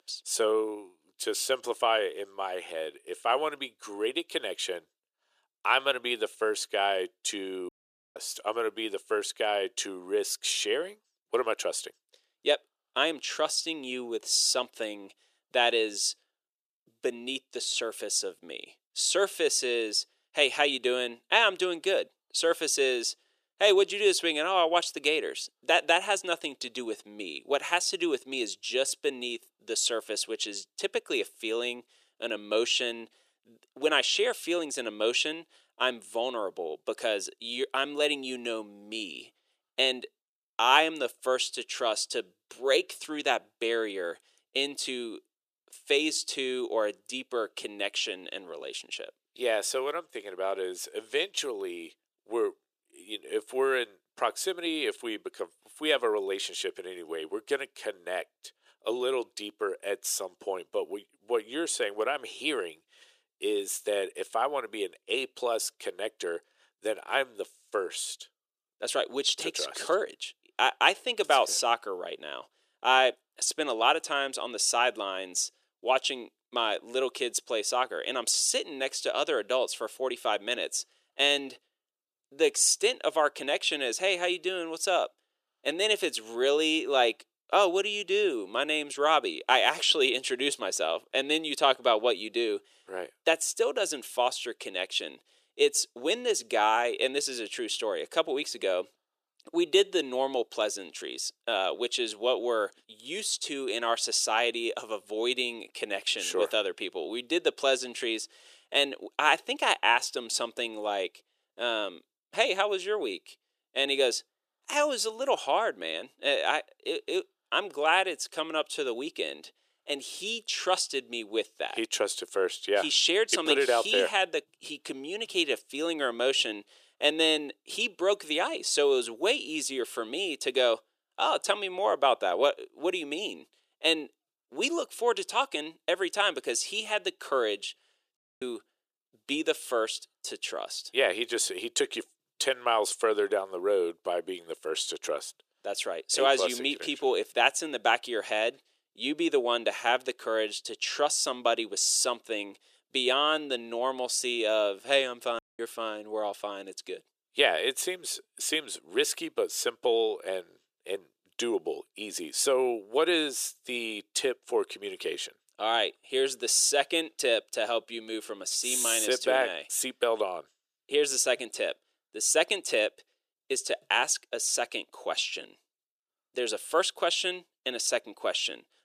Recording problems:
thin; somewhat; fading below 350 Hz
audio cutting out; at 7.5 s, at 2:18 and at 2:35

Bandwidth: 14.5 kHz